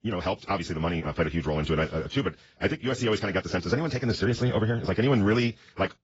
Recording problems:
garbled, watery; badly; nothing above 7.5 kHz
wrong speed, natural pitch; too fast; 1.6 times normal speed

